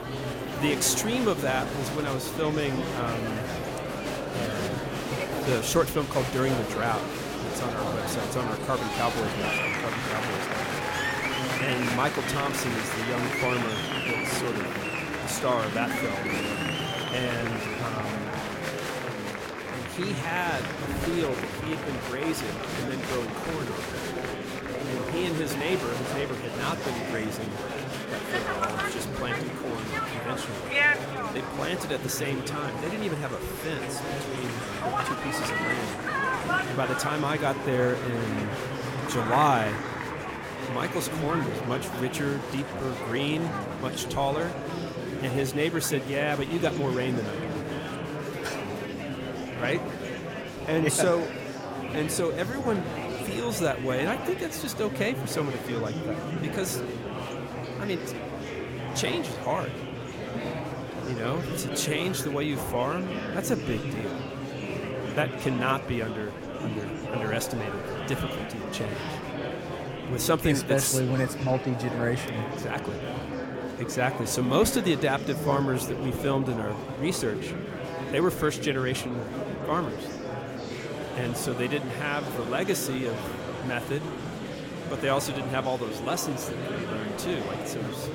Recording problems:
murmuring crowd; loud; throughout; 2 dB below the speech

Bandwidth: 16.5 kHz